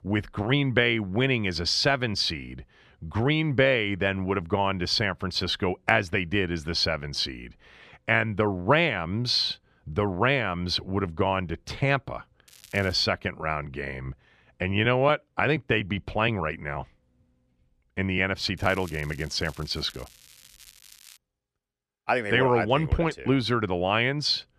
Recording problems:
crackling; faint; at 12 s and from 19 to 21 s; 25 dB below the speech

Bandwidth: 14 kHz